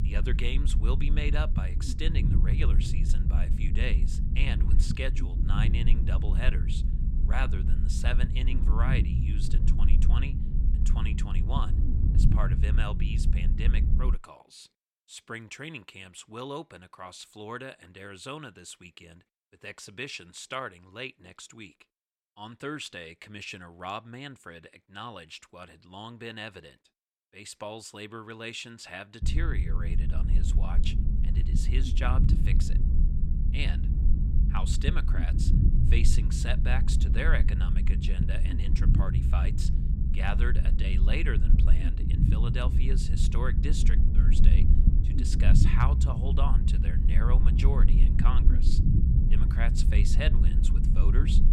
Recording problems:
low rumble; loud; until 14 s and from 29 s on; 4 dB below the speech

